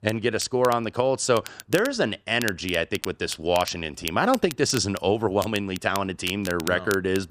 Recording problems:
crackle, like an old record; noticeable; 15 dB below the speech

